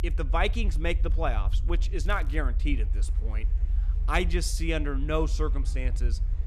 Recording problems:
low rumble; noticeable; throughout; 20 dB below the speech
murmuring crowd; faint; throughout; 30 dB below the speech
crackling; faint; at 2 s; 25 dB below the speech

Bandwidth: 14 kHz